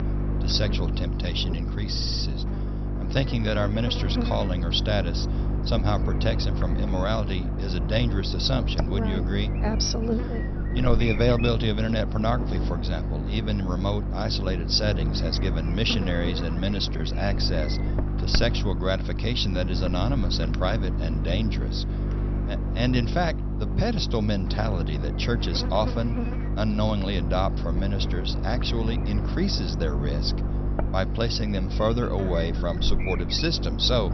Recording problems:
high frequencies cut off; noticeable; nothing above 6 kHz
electrical hum; loud; throughout; 50 Hz, 8 dB below the speech
audio stuttering; at 2 s

